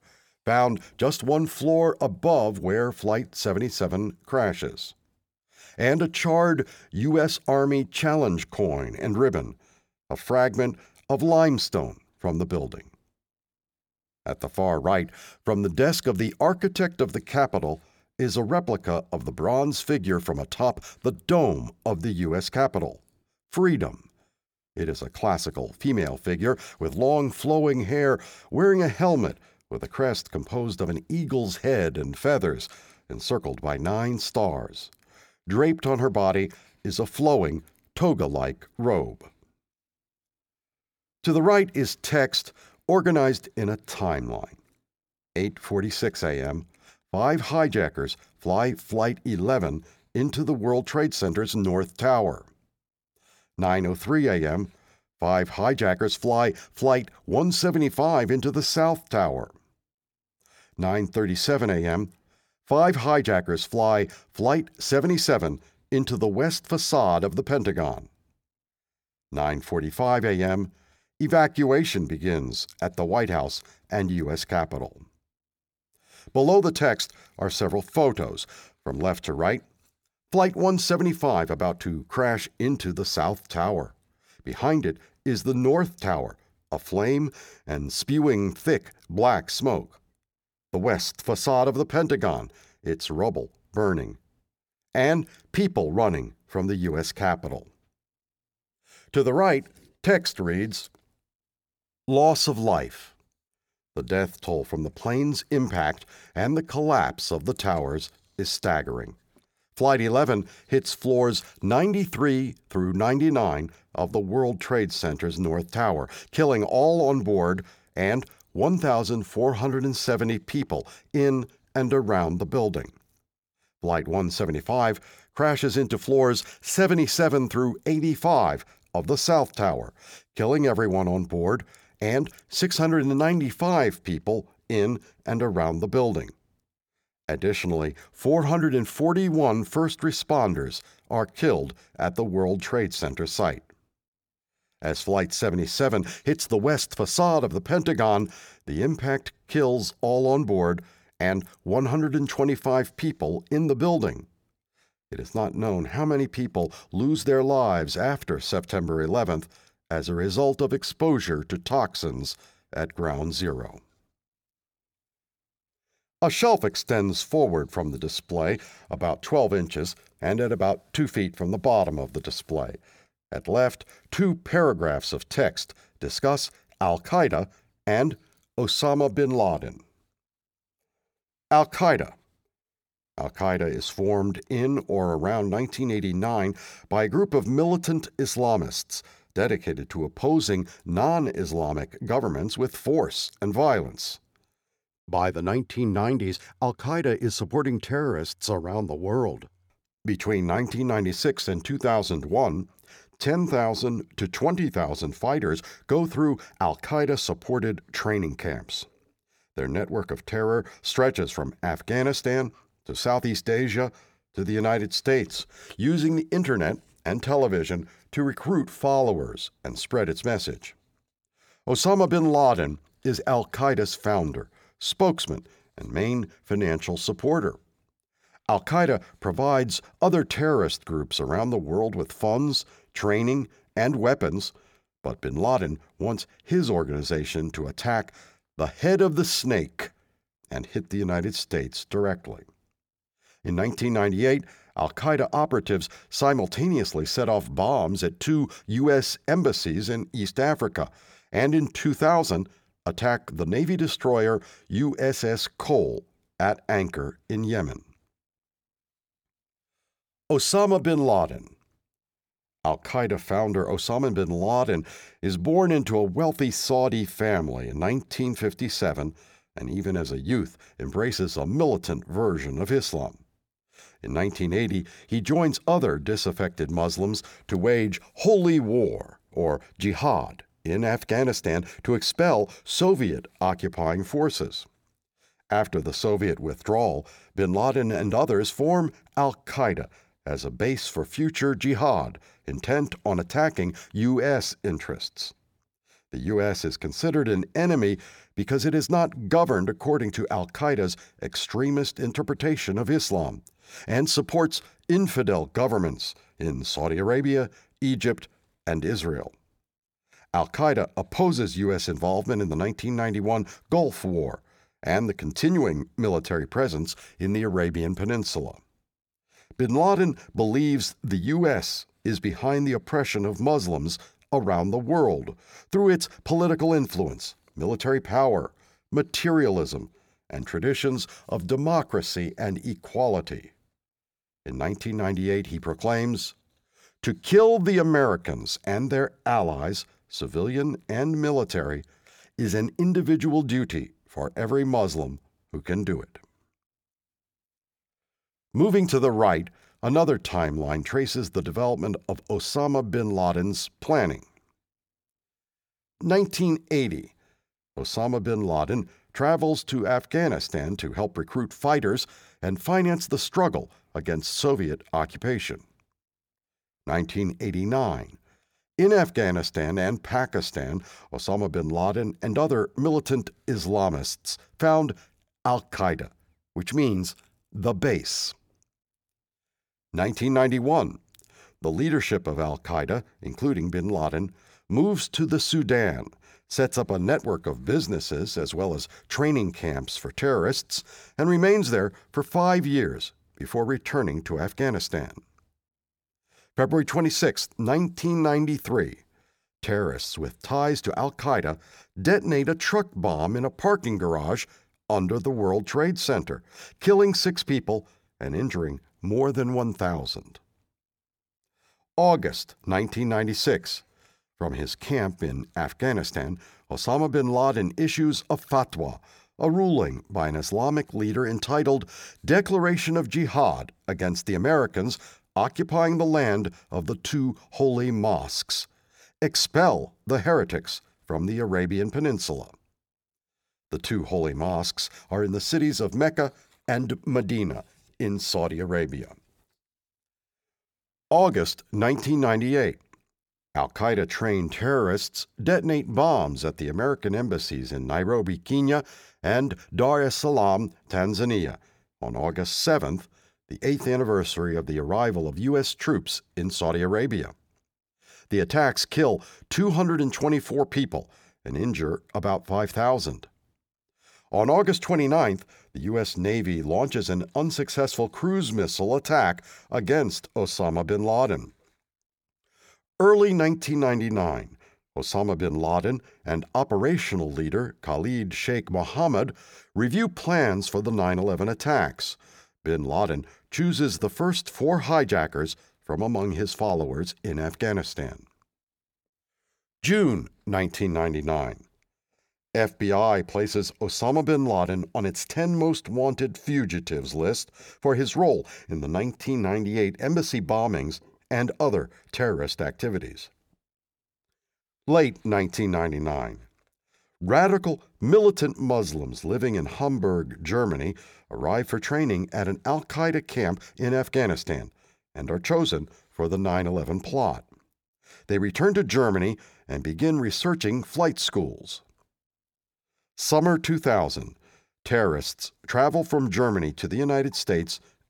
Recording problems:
none

